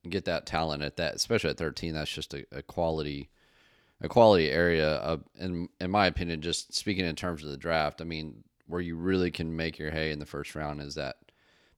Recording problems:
none

